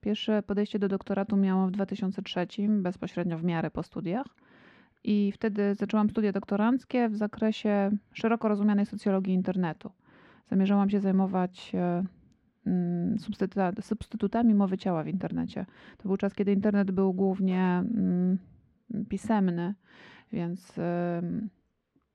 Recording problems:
muffled; slightly; fading above 3 kHz

